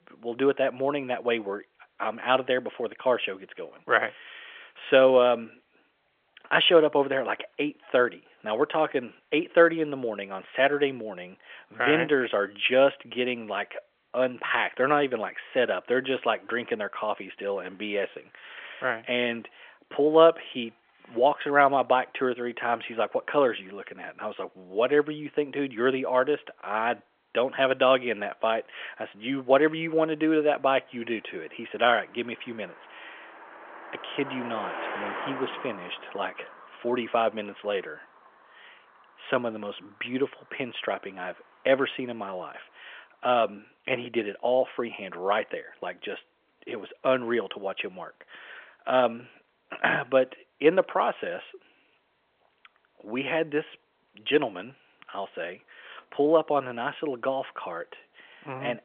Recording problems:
phone-call audio; nothing above 3.5 kHz
traffic noise; noticeable; throughout; 15 dB below the speech

